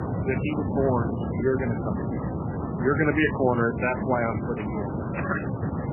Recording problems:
garbled, watery; badly; nothing above 3 kHz
wind noise on the microphone; heavy; 6 dB below the speech

